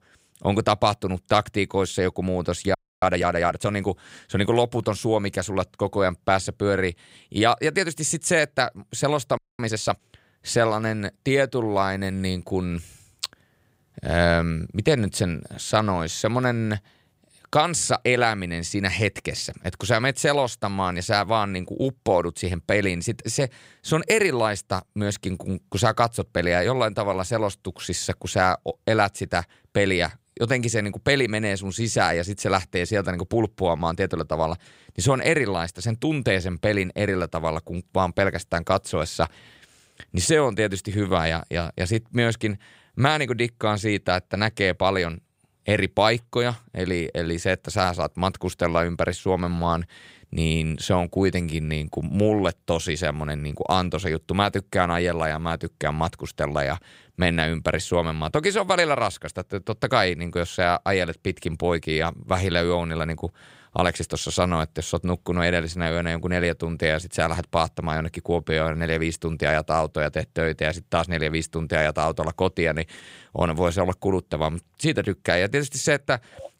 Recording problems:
audio freezing; at 3 s and at 9.5 s

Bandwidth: 15.5 kHz